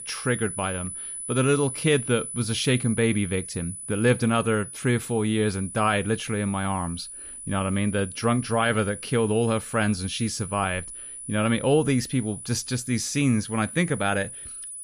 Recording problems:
high-pitched whine; loud; throughout; 10 kHz, 10 dB below the speech

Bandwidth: 15 kHz